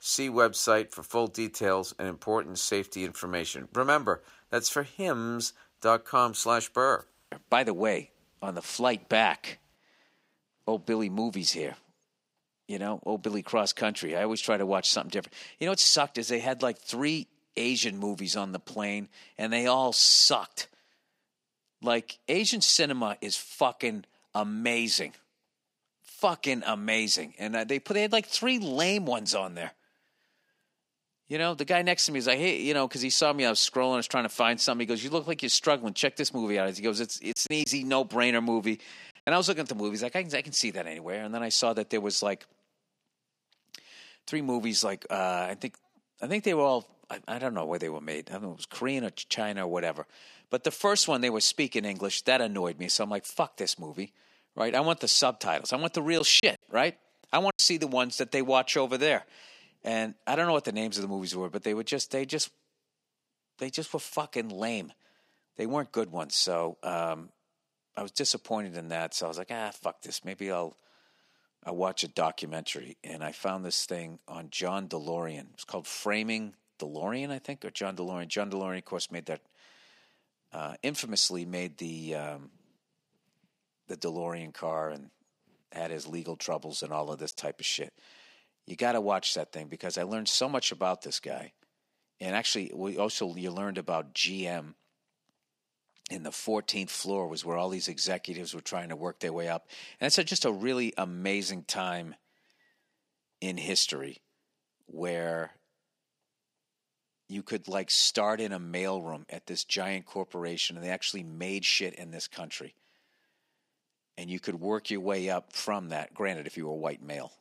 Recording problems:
thin; very slightly; fading below 1 kHz
choppy; occasionally; at 37 s and from 56 to 58 s; 5% of the speech affected

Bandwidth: 15.5 kHz